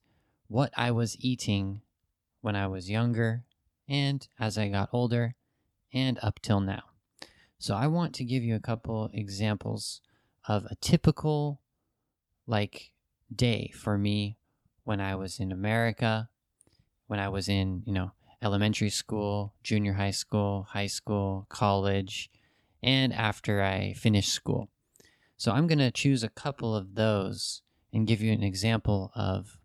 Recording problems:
uneven, jittery; strongly; from 2.5 to 28 s

